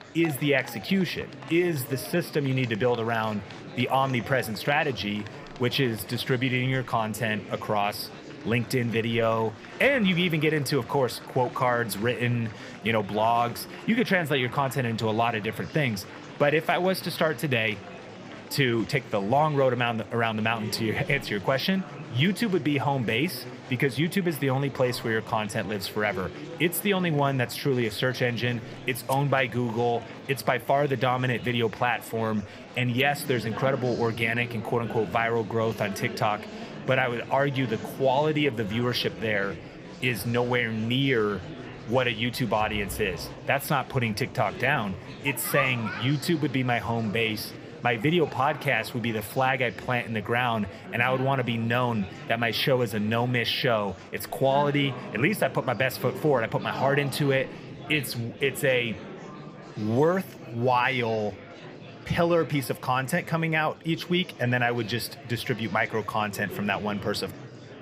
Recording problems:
murmuring crowd; noticeable; throughout; 15 dB below the speech

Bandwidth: 15 kHz